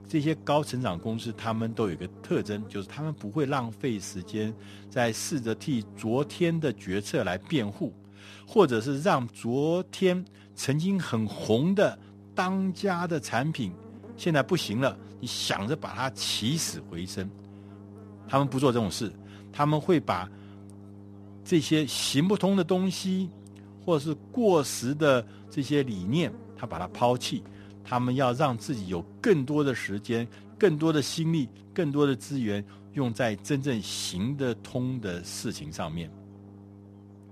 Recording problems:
electrical hum; faint; throughout; 50 Hz, 25 dB below the speech

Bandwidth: 13.5 kHz